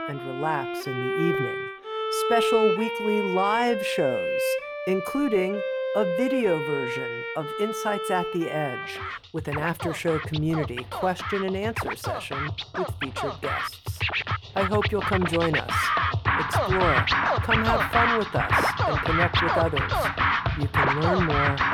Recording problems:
background music; very loud; throughout; 2 dB above the speech

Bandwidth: 18.5 kHz